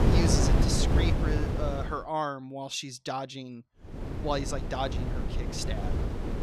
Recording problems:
wind noise on the microphone; heavy; until 2 s and from 4 s on; 3 dB below the speech

